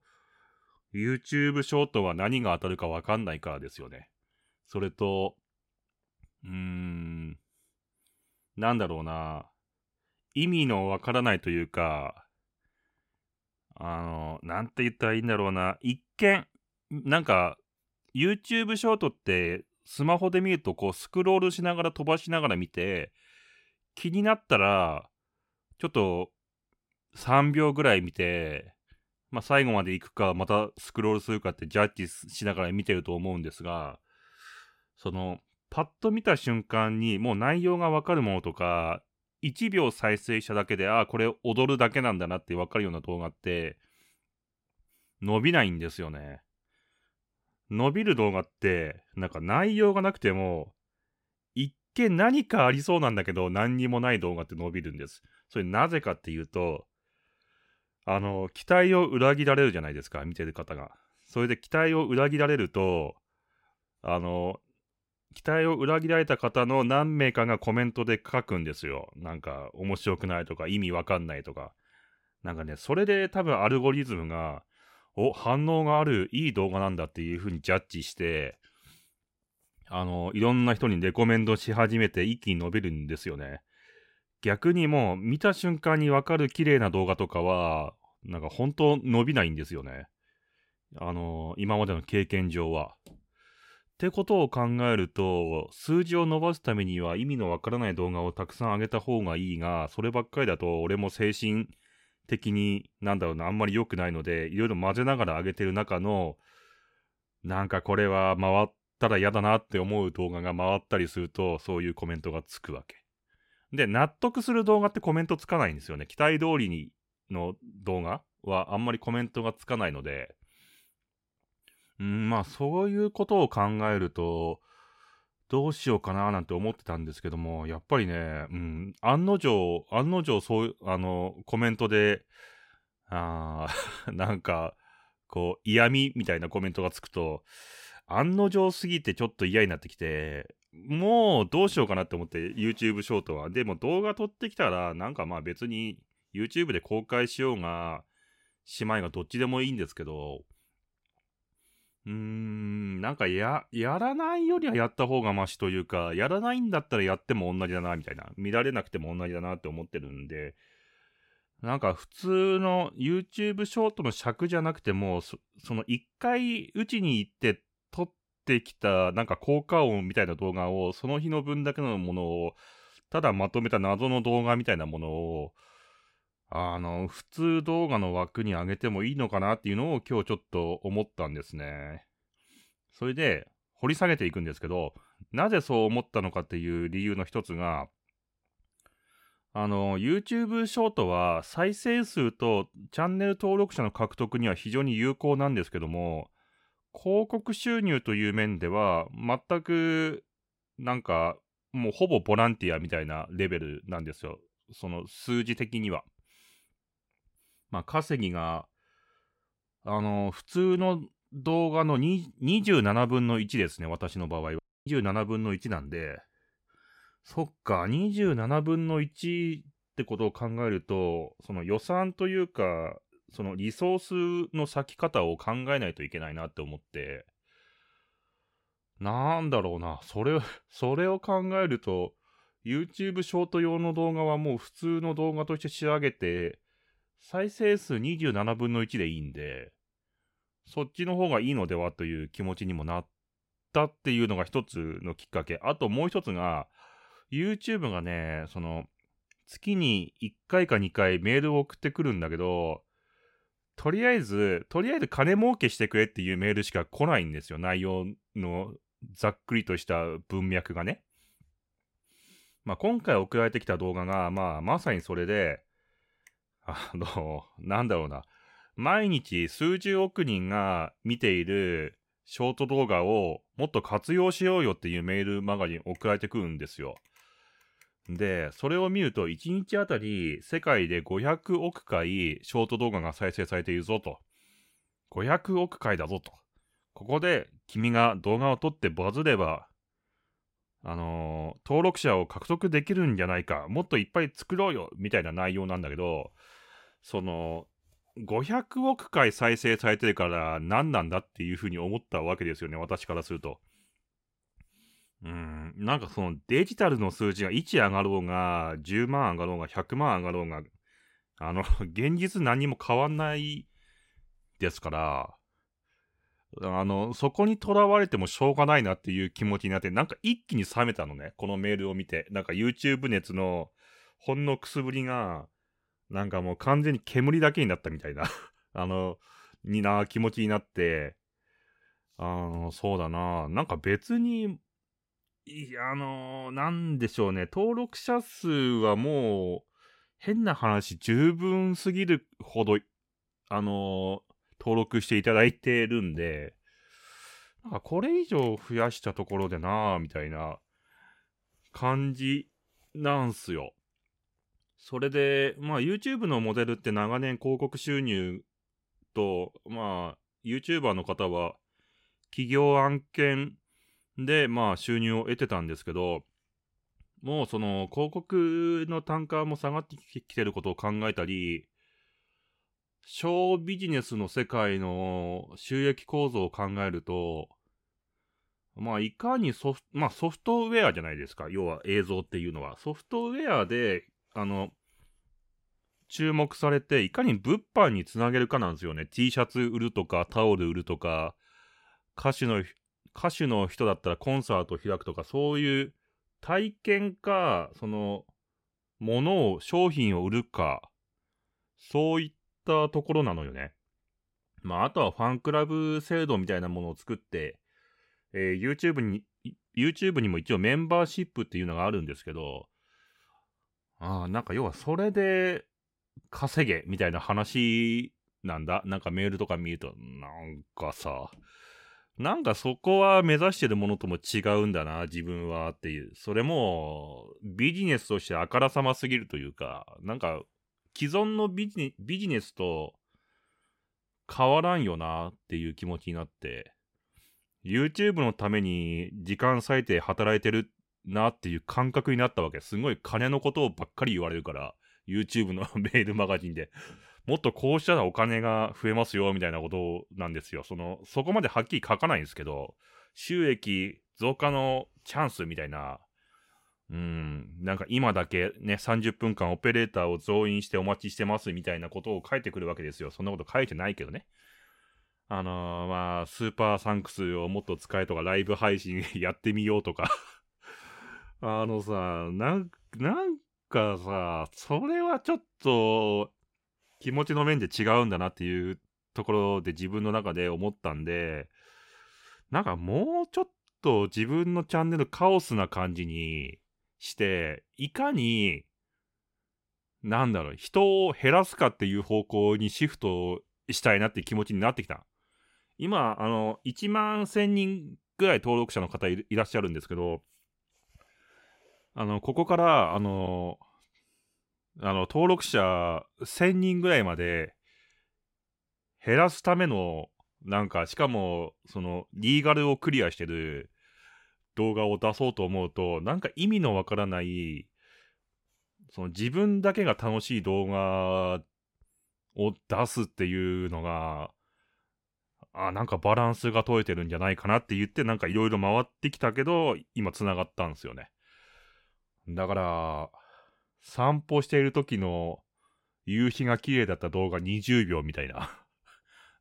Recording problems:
audio cutting out; at 3:35

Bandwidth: 16 kHz